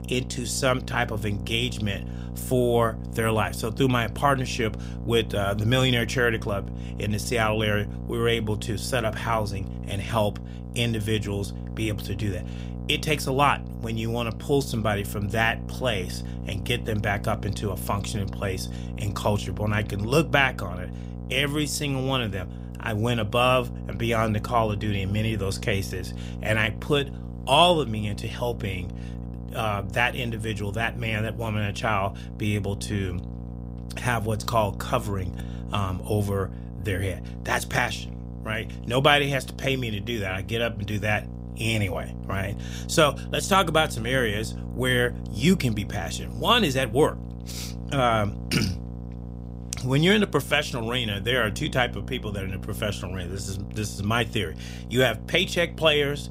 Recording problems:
electrical hum; noticeable; throughout; 60 Hz, 20 dB below the speech

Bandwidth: 15.5 kHz